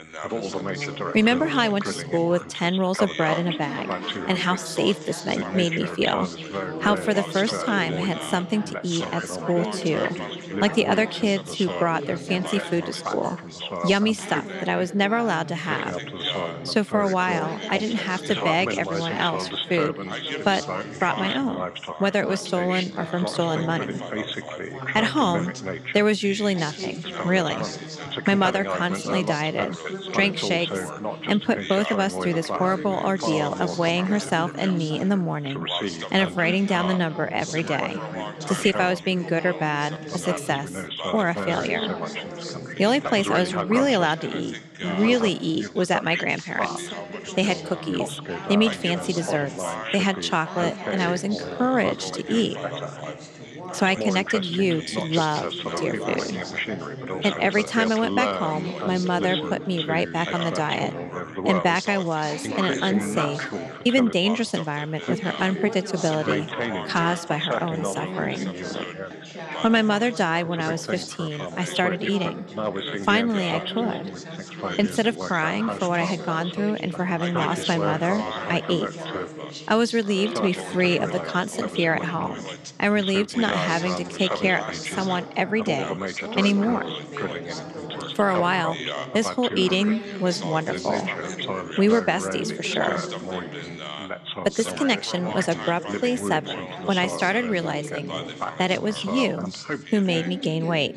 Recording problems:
background chatter; loud; throughout; 3 voices, 6 dB below the speech

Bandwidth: 15 kHz